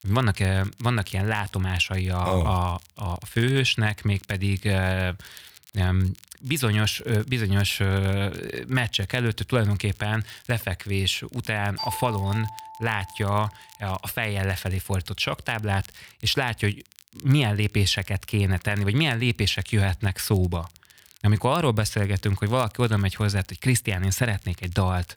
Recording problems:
crackle, like an old record; faint; 25 dB below the speech
doorbell; noticeable; from 12 to 13 s; peak 7 dB below the speech

